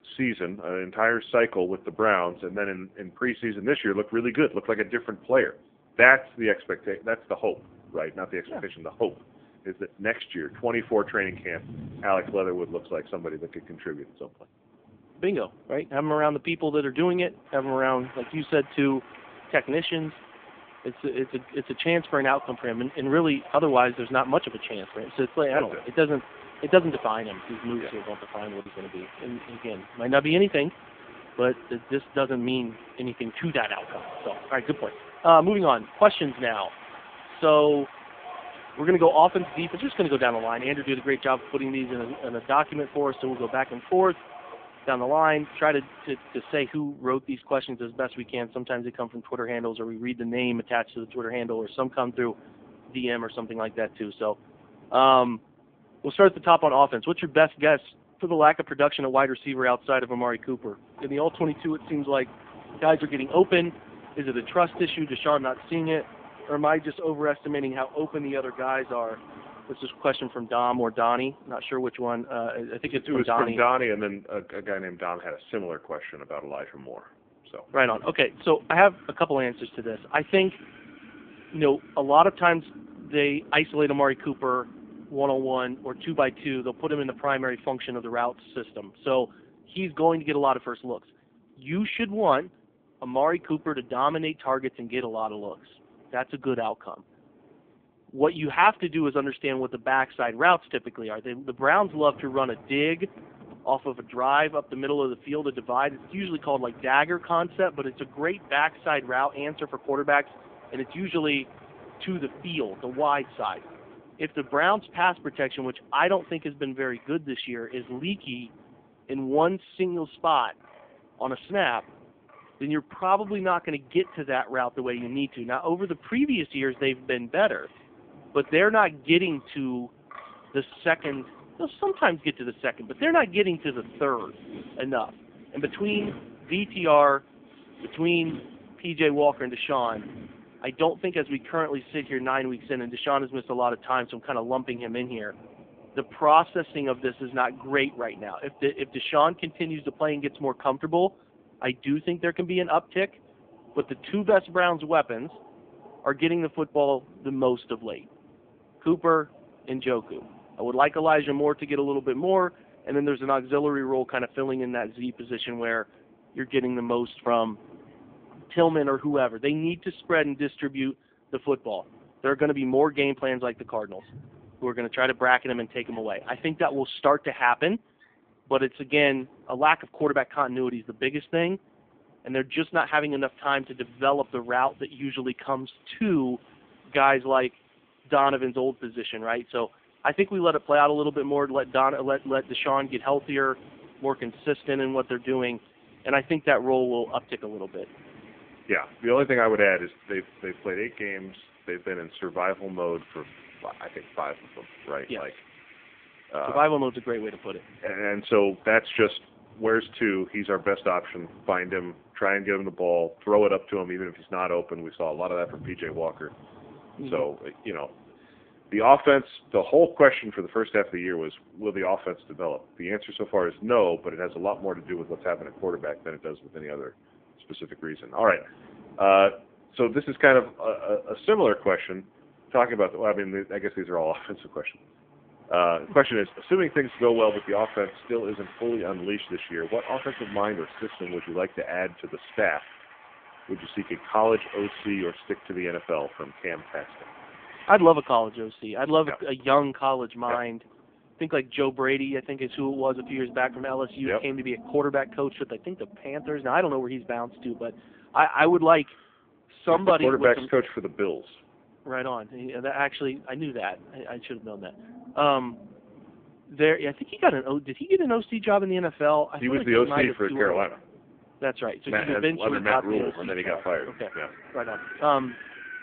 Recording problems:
phone-call audio; poor line
wind in the background; faint; throughout; 20 dB below the speech
choppy; occasionally; at 28 s; 2% of the speech affected

